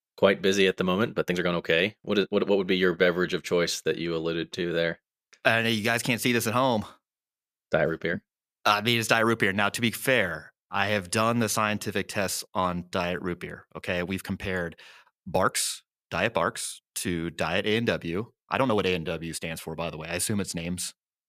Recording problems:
uneven, jittery; strongly; from 1 to 21 s

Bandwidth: 14.5 kHz